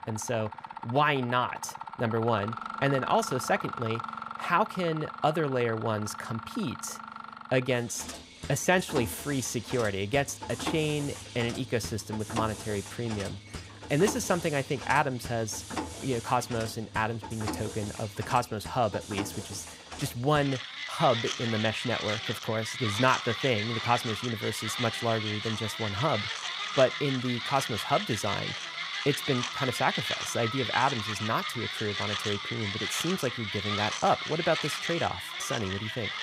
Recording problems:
machinery noise; loud; throughout; 5 dB below the speech

